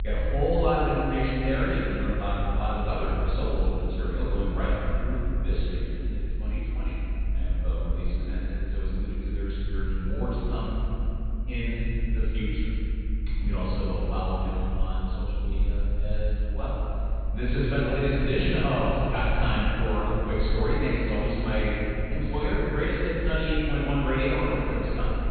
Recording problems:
room echo; strong; dies away in 3 s
off-mic speech; far
high frequencies cut off; severe; nothing above 4 kHz
low rumble; faint; throughout; 25 dB below the speech

